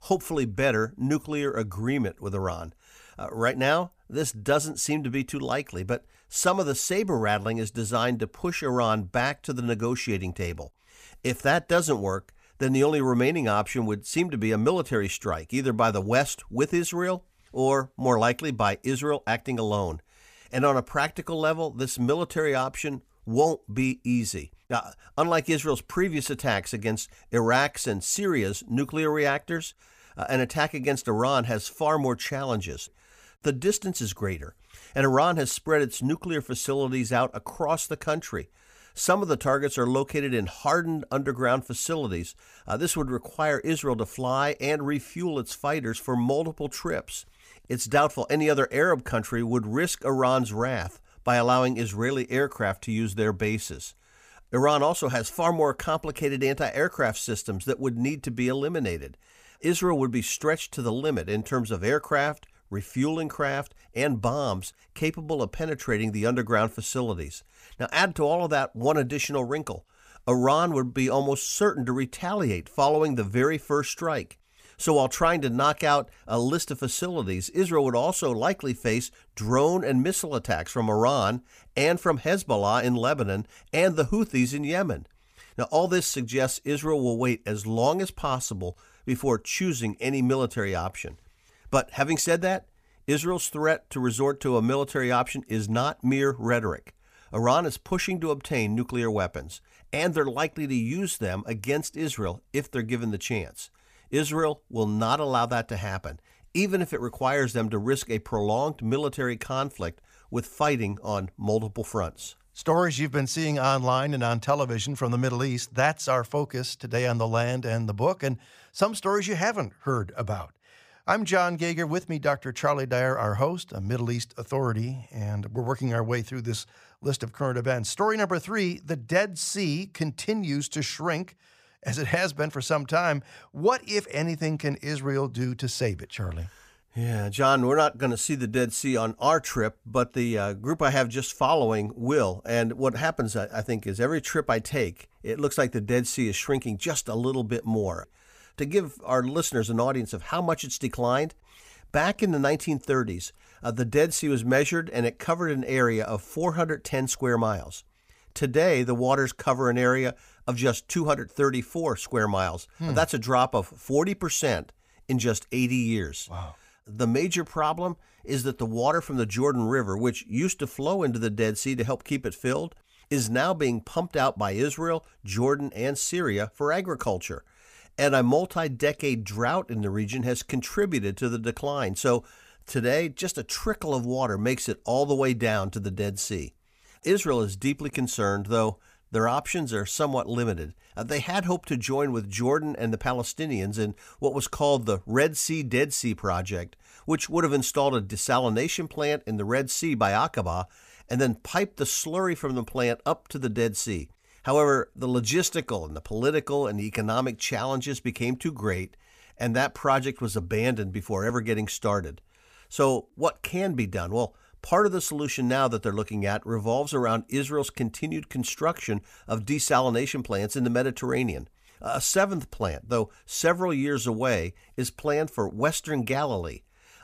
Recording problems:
none

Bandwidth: 15 kHz